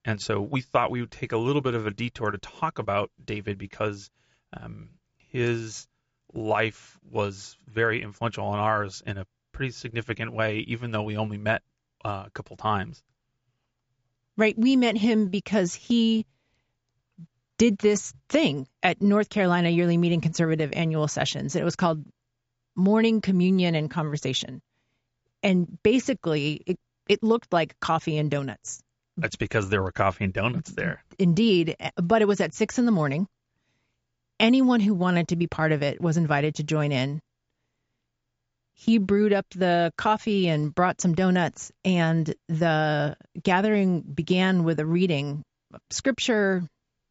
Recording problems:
high frequencies cut off; noticeable; nothing above 8 kHz

